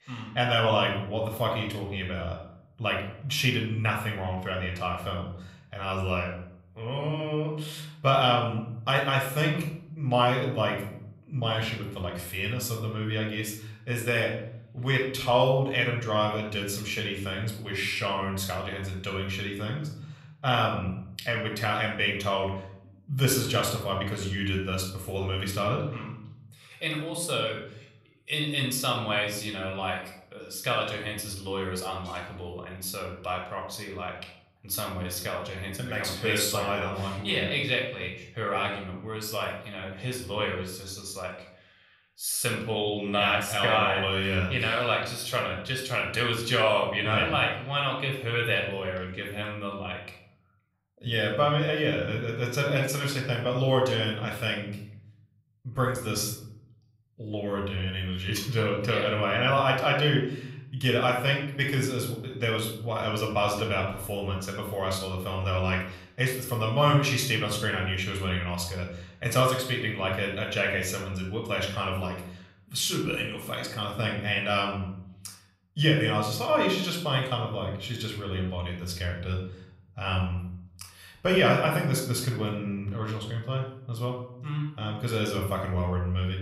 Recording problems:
room echo; noticeable; dies away in 0.7 s
off-mic speech; somewhat distant

